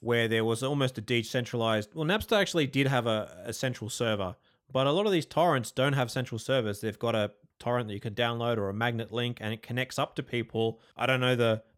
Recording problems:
none

